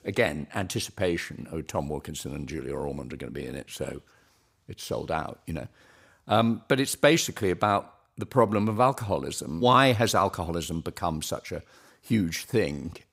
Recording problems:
none

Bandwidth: 15.5 kHz